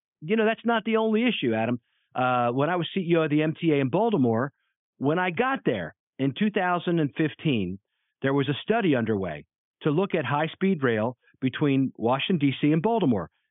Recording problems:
high frequencies cut off; severe; nothing above 3.5 kHz

